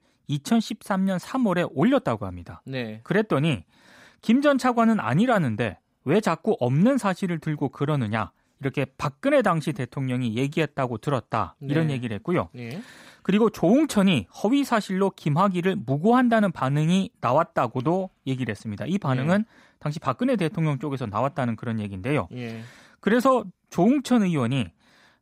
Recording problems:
none

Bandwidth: 15.5 kHz